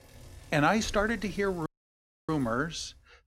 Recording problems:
traffic noise; noticeable; until 2.5 s; 20 dB below the speech
audio cutting out; at 1.5 s for 0.5 s

